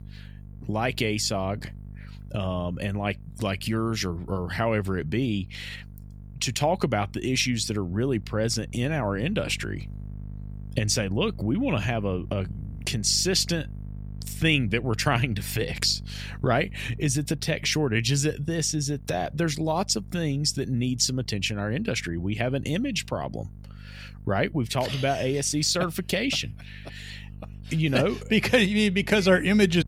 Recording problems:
electrical hum; faint; throughout; 50 Hz, 25 dB below the speech

